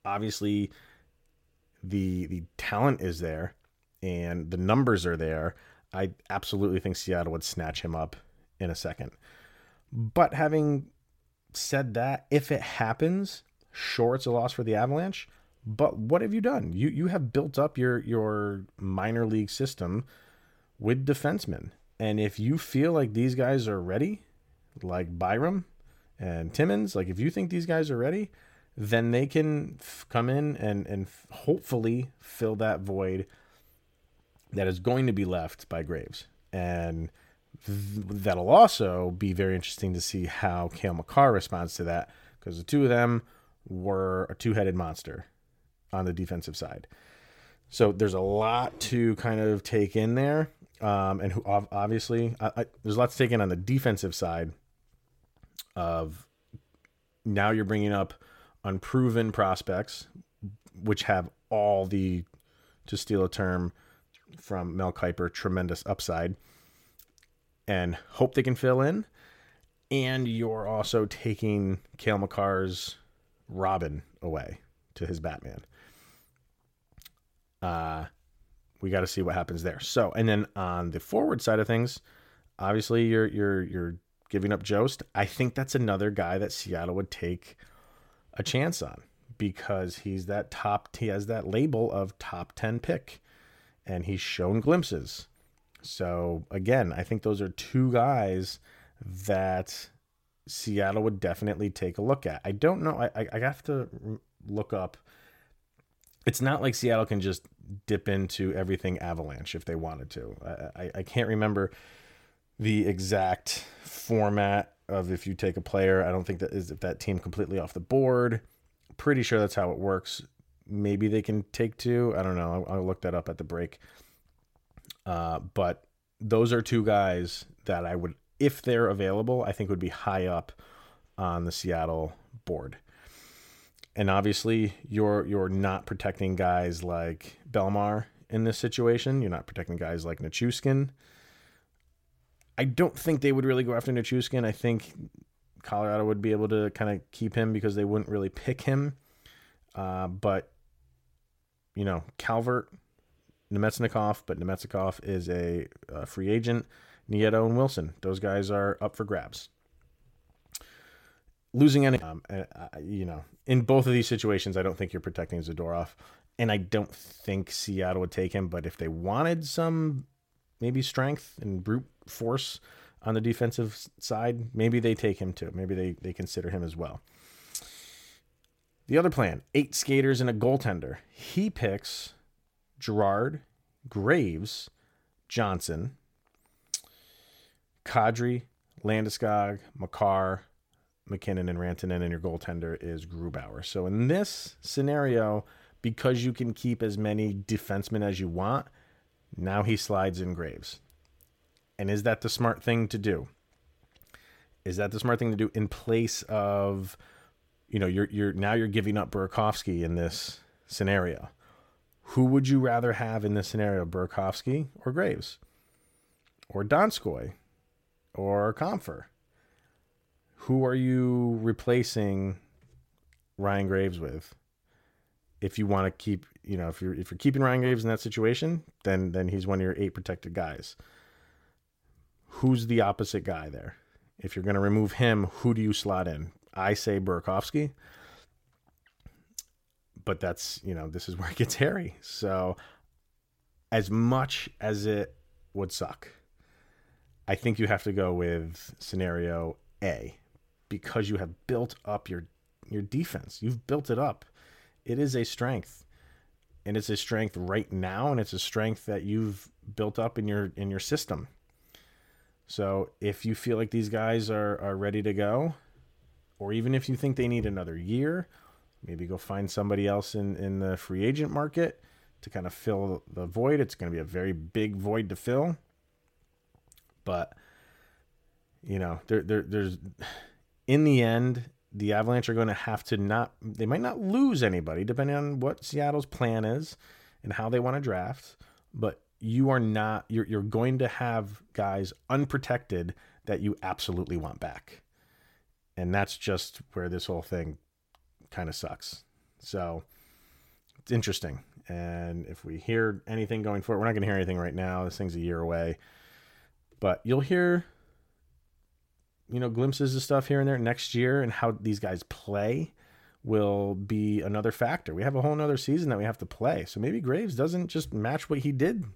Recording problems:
none

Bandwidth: 16.5 kHz